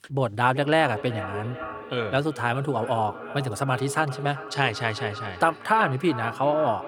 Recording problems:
echo of what is said; strong; throughout; 380 ms later, 10 dB below the speech

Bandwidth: 18.5 kHz